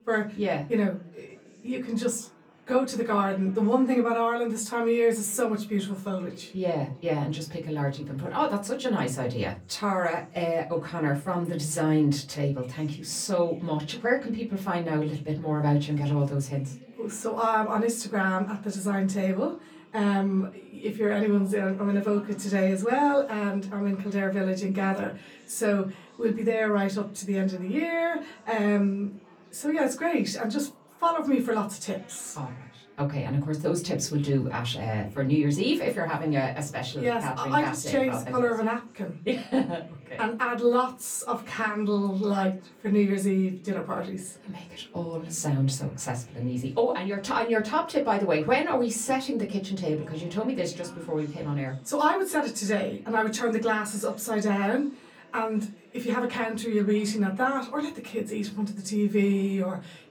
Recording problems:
off-mic speech; far
room echo; very slight; dies away in 0.3 s
chatter from many people; faint; throughout; 25 dB below the speech

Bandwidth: 18.5 kHz